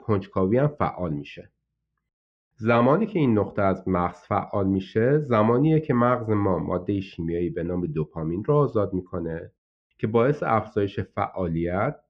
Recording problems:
muffled; very; fading above 2.5 kHz

